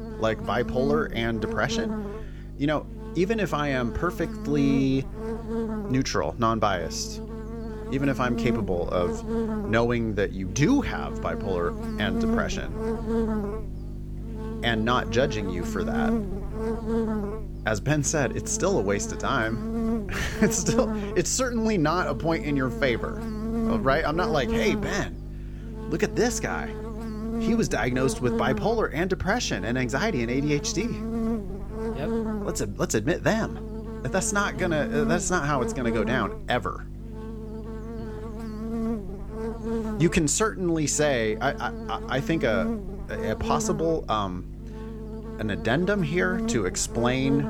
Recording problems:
electrical hum; loud; throughout; 50 Hz, 9 dB below the speech

